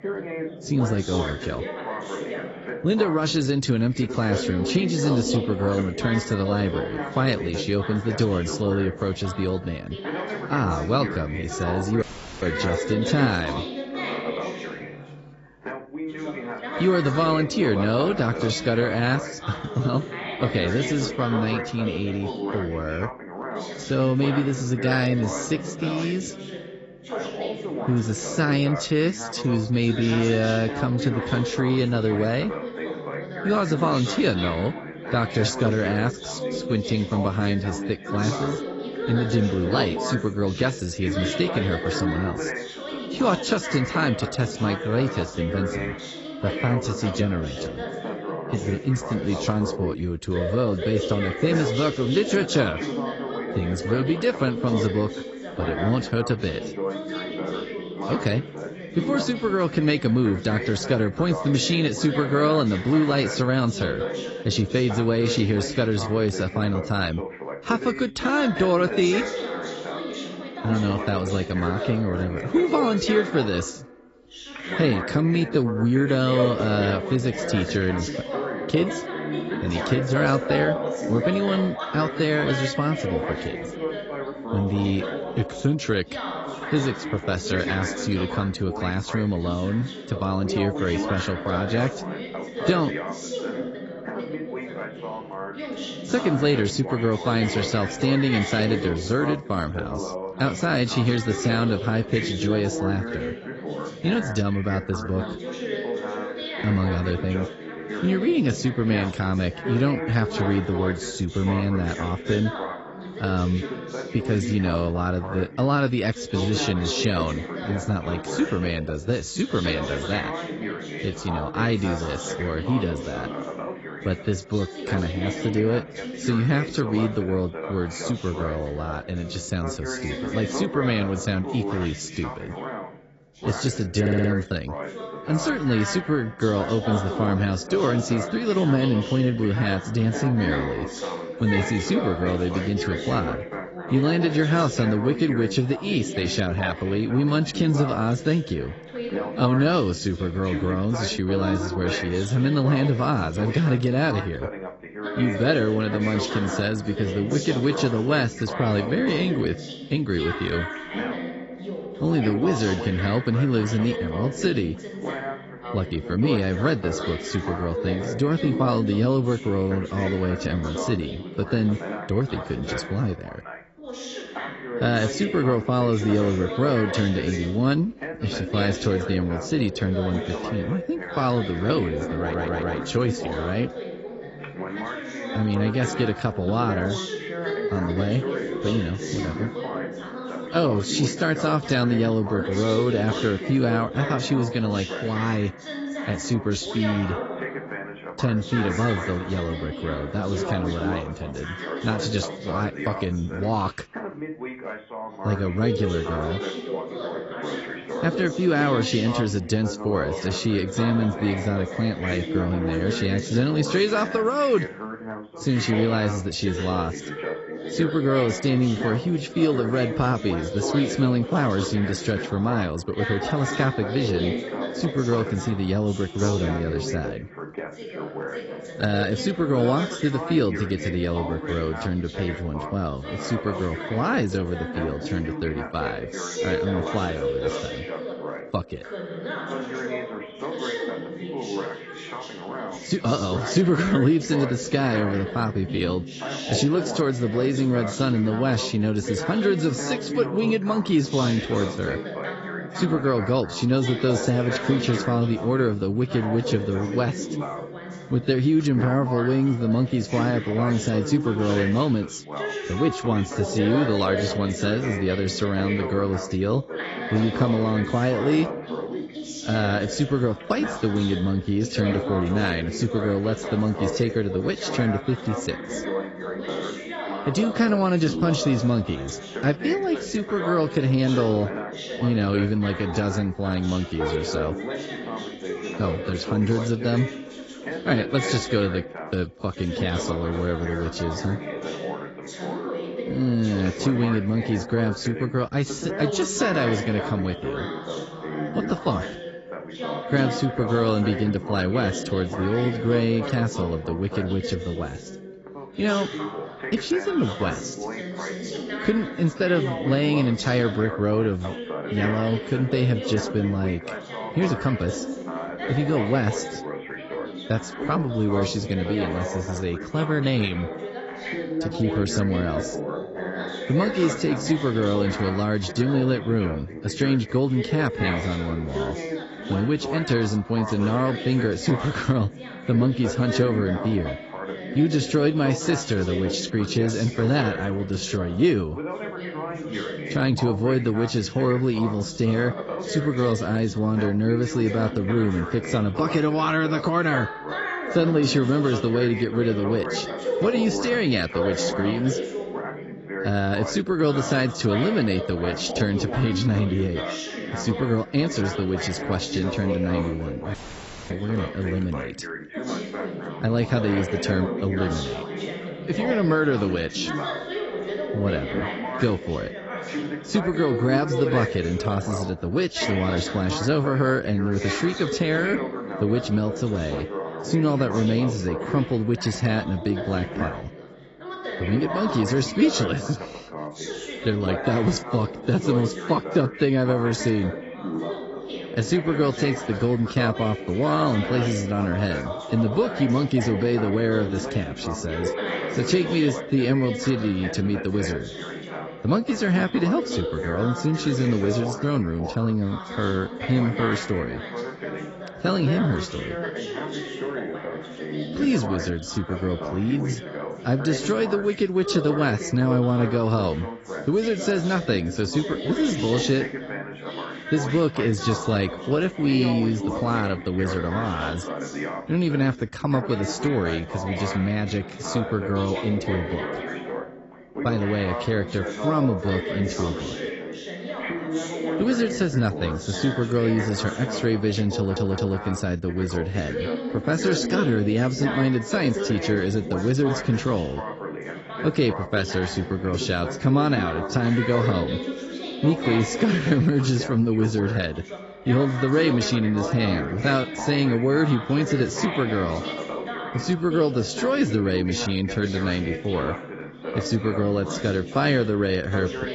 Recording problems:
garbled, watery; badly; nothing above 8 kHz
background chatter; loud; throughout; 2 voices, 7 dB below the speech
audio cutting out; at 12 s and at 6:01 for 0.5 s
audio stuttering; at 2:14, at 3:02 and at 7:15

